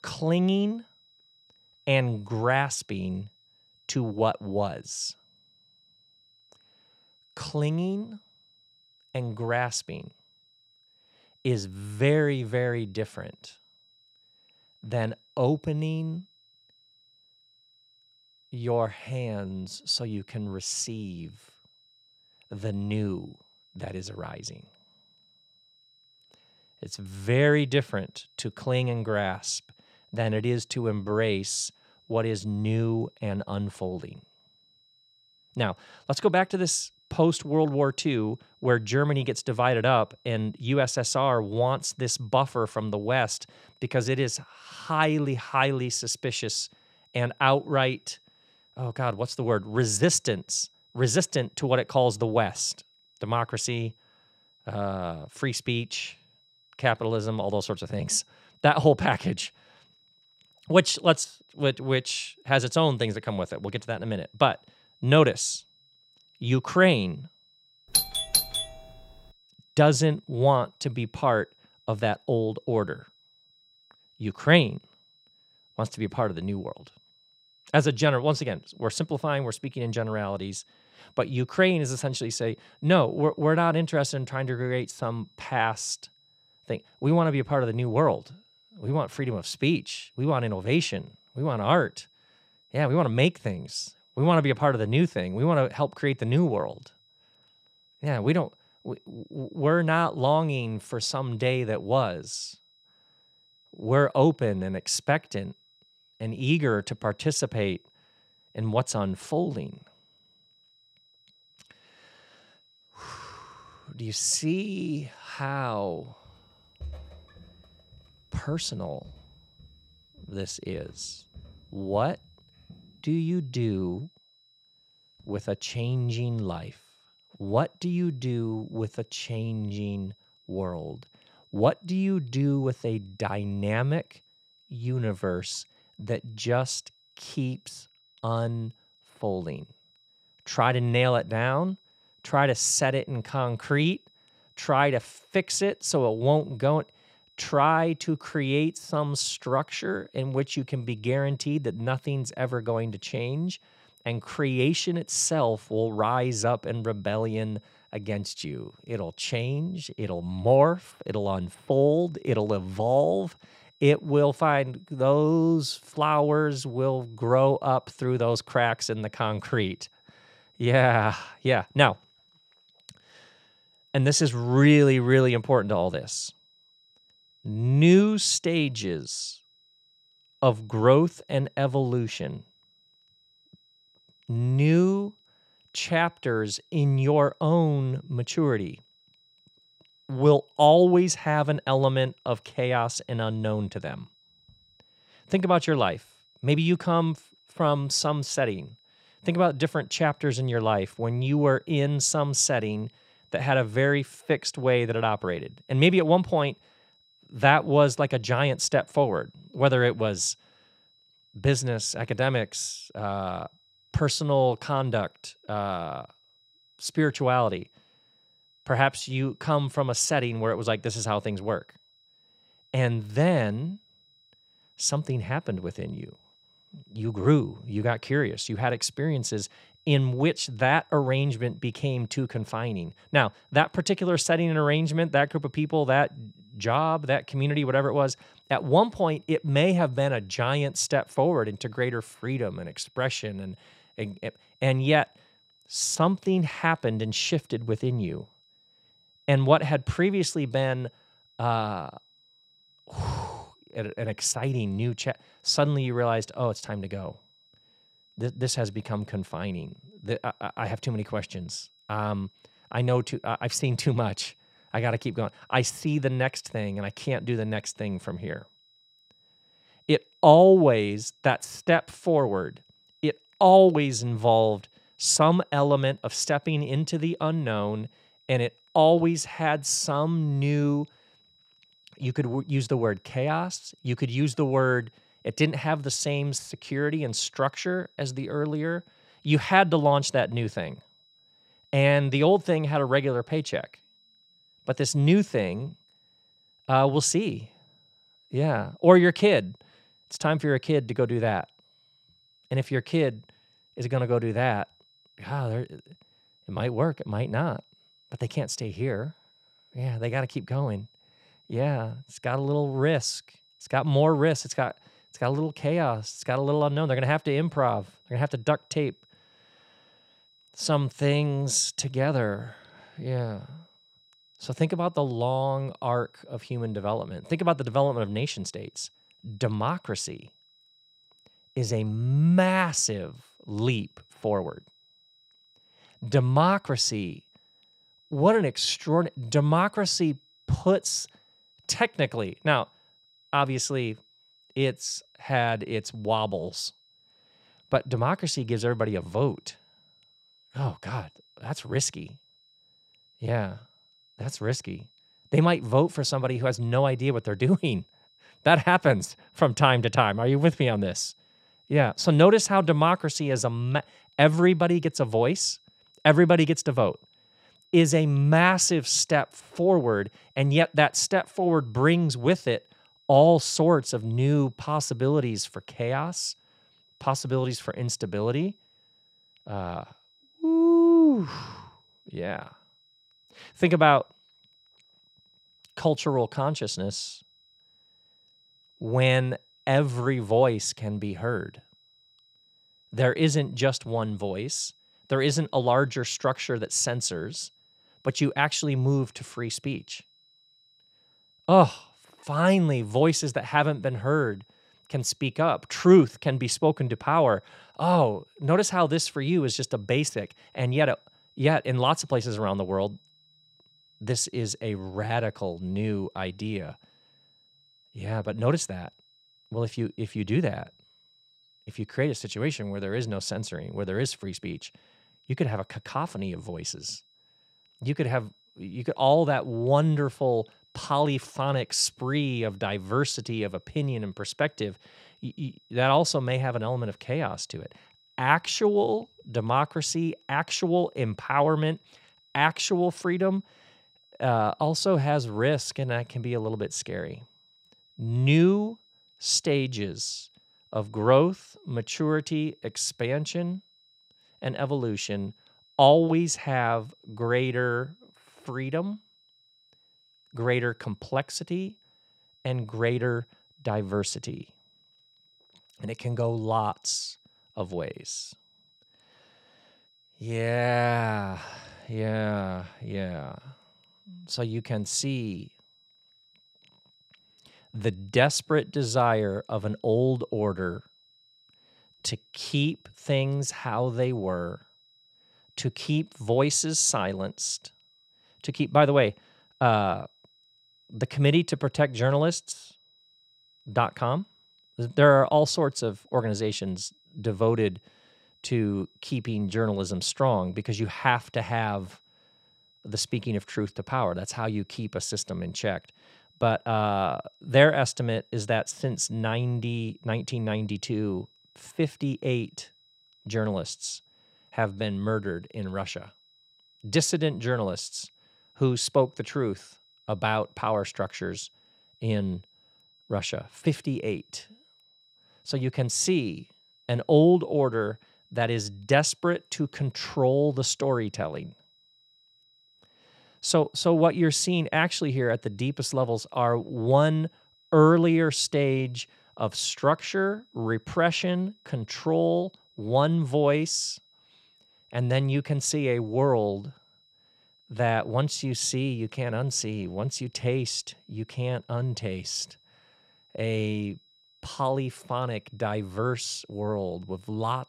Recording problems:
high-pitched whine; faint; throughout; 4 kHz, 35 dB below the speech
doorbell; loud; at 1:08; peak 3 dB above the speech
footsteps; faint; from 1:56 to 2:03; peak 15 dB below the speech

